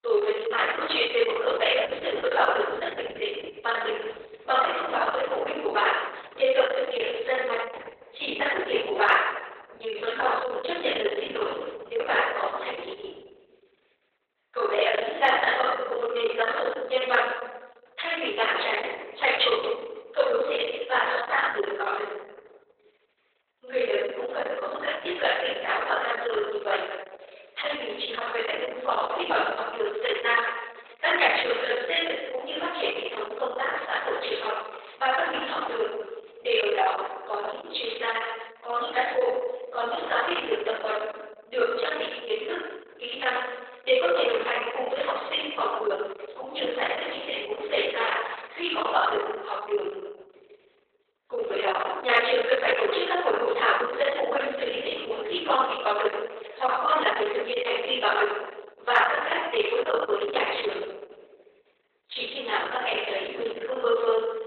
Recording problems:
off-mic speech; far
garbled, watery; badly; nothing above 3.5 kHz
thin; very; fading below 400 Hz
room echo; noticeable; dies away in 1.1 s

